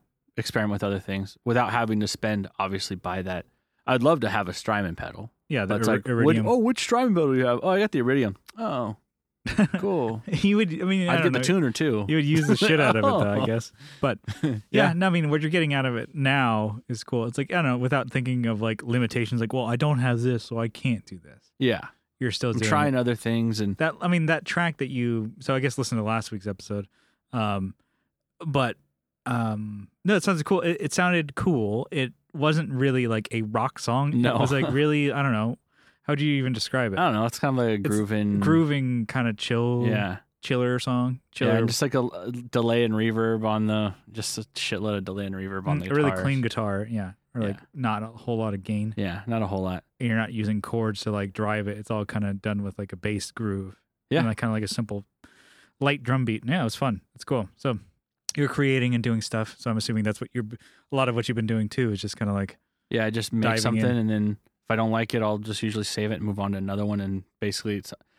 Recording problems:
none

